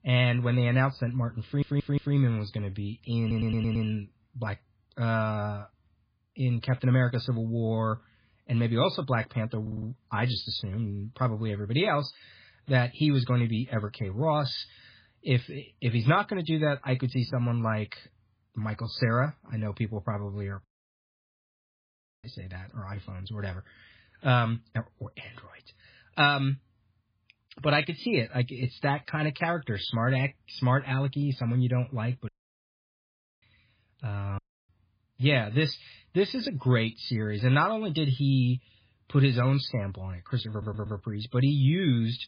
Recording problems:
garbled, watery; badly
audio stuttering; 4 times, first at 1.5 s
audio cutting out; at 21 s for 1.5 s, at 32 s for 1 s and at 34 s

